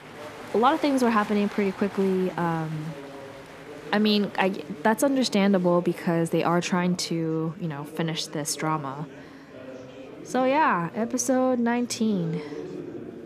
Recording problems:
murmuring crowd; noticeable; throughout; 15 dB below the speech

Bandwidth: 14.5 kHz